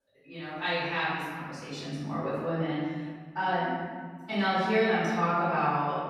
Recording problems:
room echo; strong; dies away in 1.8 s
off-mic speech; far

